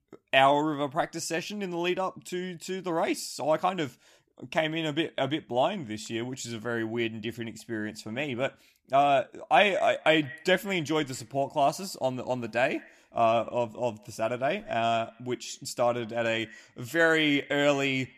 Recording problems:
echo of what is said; faint; from 9.5 s on; 160 ms later, 20 dB below the speech

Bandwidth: 14.5 kHz